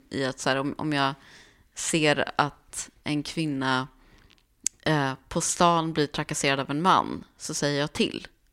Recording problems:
none

